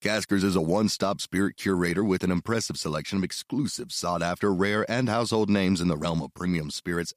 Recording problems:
none

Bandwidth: 15 kHz